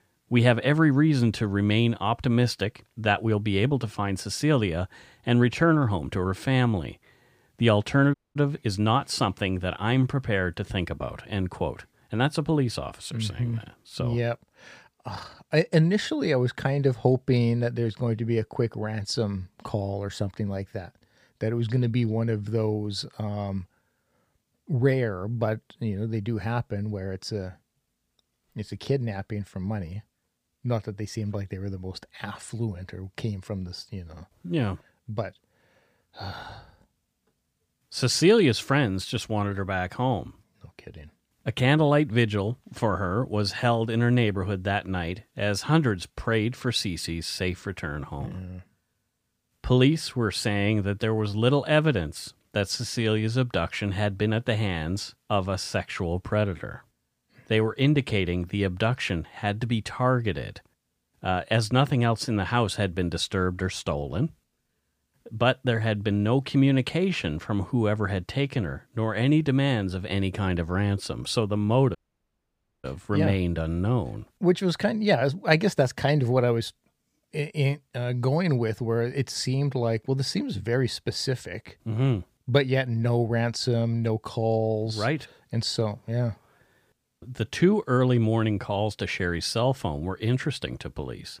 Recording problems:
audio cutting out; at 8 s and at 1:12 for 1 s

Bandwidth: 15 kHz